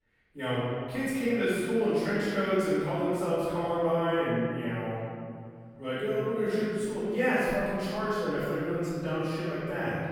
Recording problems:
room echo; strong; dies away in 2.4 s
off-mic speech; far

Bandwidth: 18 kHz